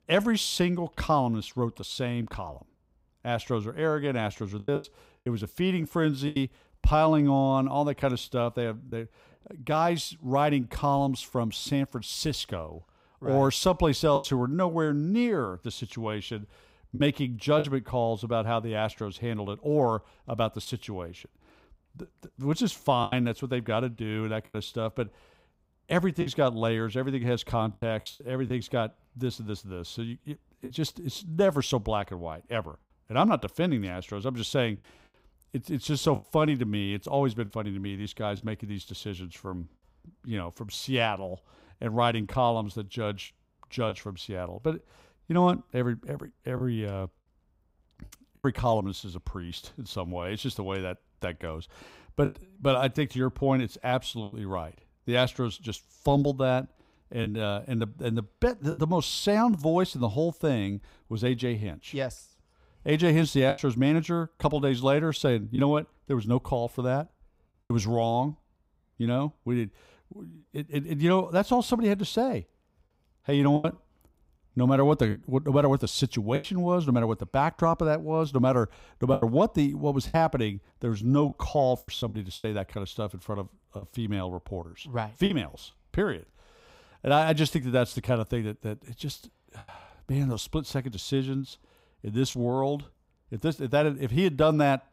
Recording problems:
choppy; occasionally; 3% of the speech affected

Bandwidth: 15.5 kHz